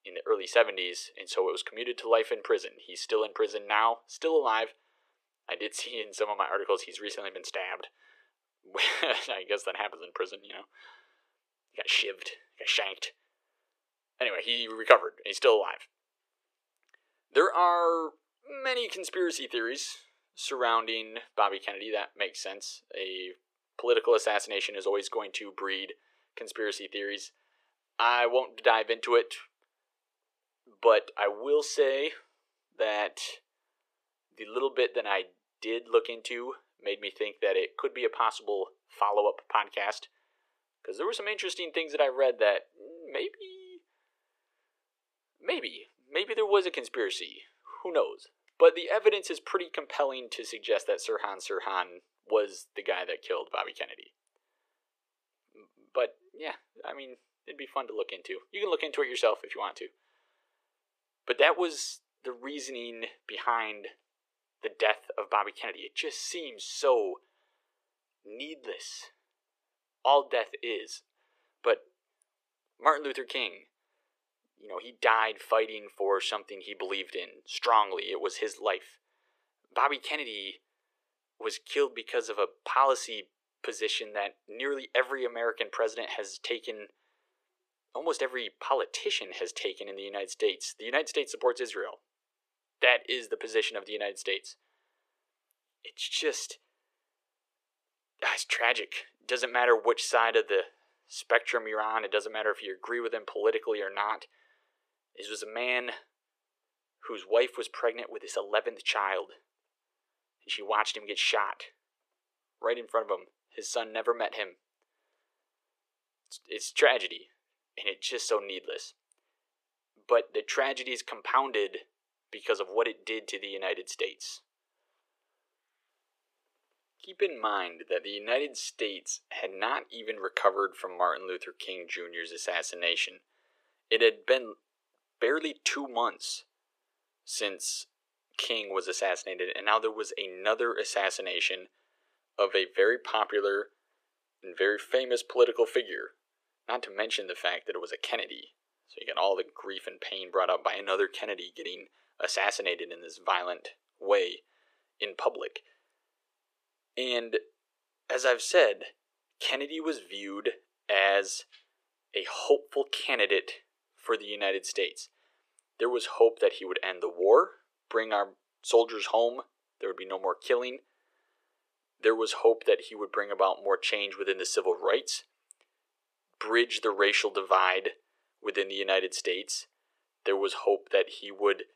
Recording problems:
thin; very; fading below 400 Hz

